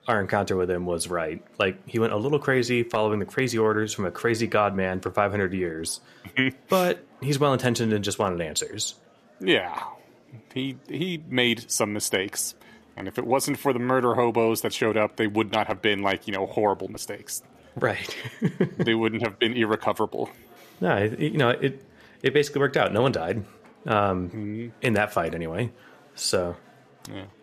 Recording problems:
murmuring crowd; faint; throughout; 30 dB below the speech

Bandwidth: 14.5 kHz